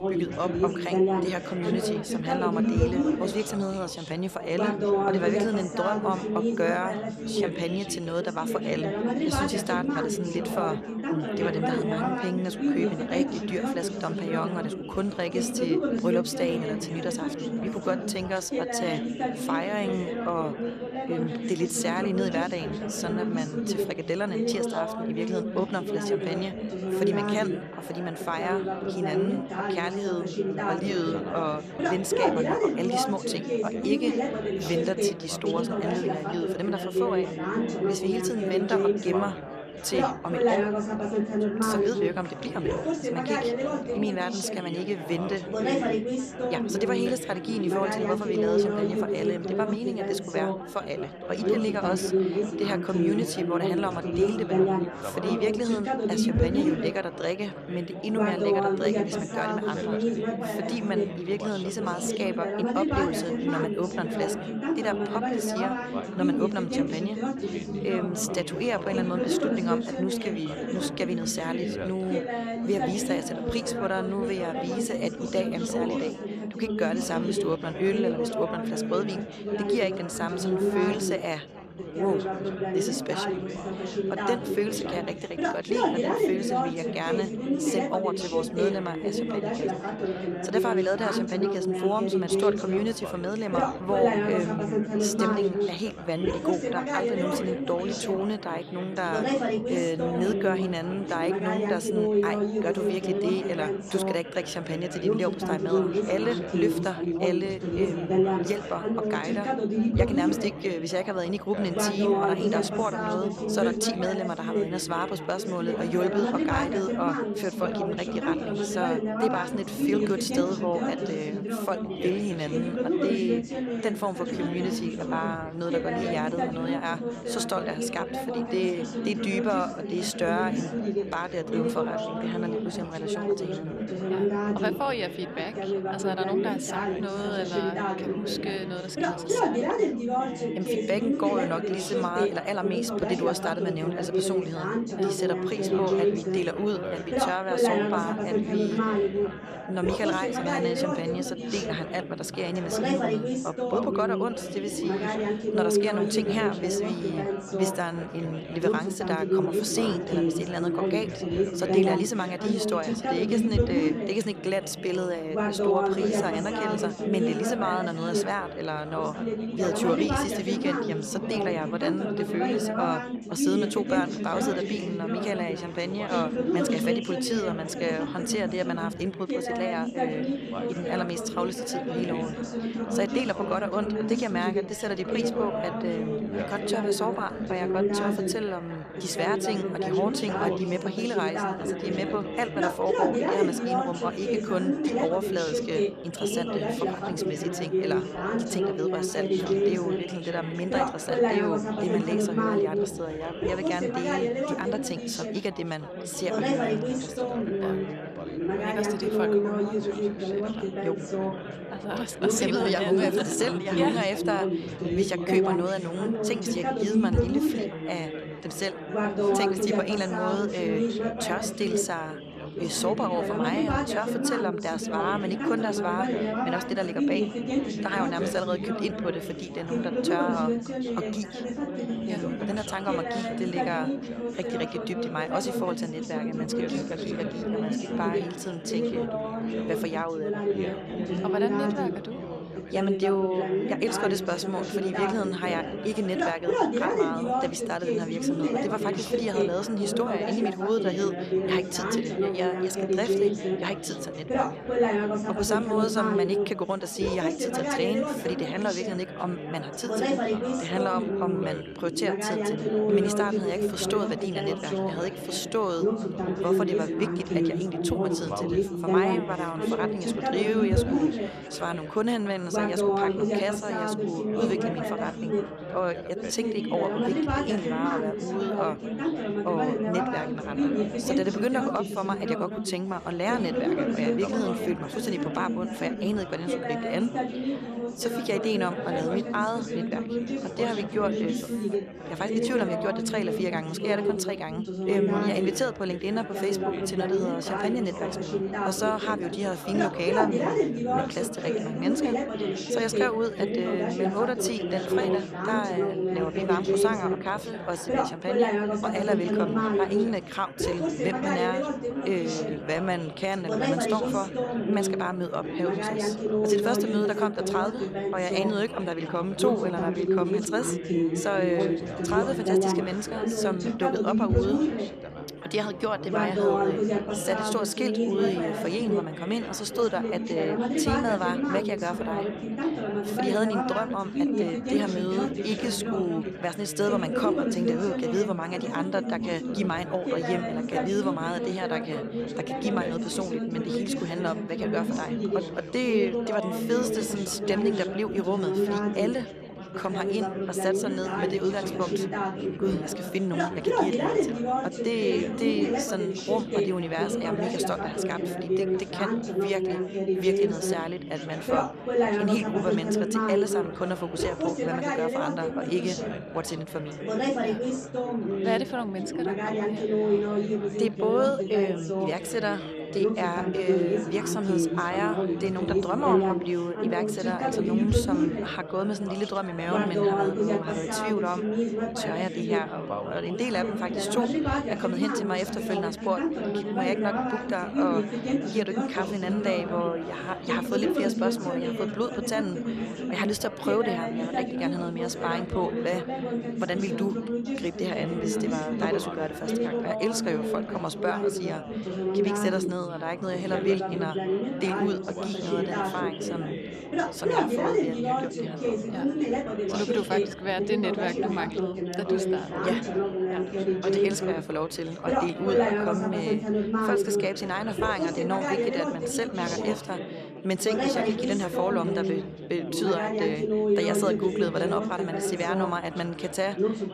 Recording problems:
chatter from many people; very loud; throughout; 2 dB above the speech

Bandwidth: 14 kHz